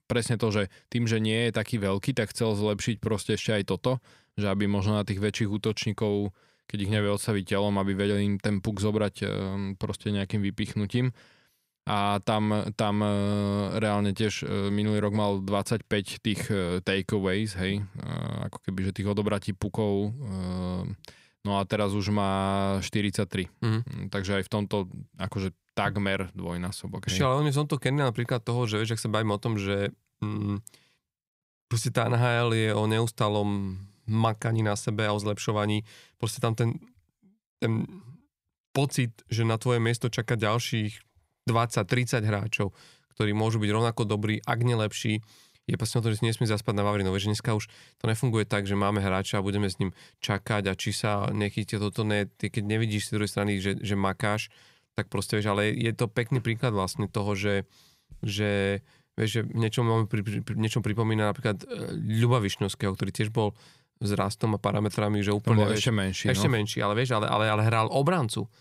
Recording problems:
none

